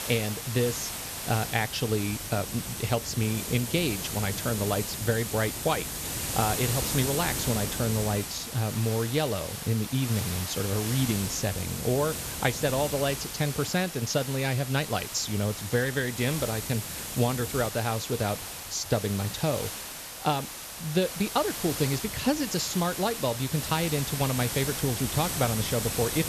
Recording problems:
high frequencies cut off; noticeable; nothing above 8 kHz
hiss; loud; throughout; 4 dB below the speech

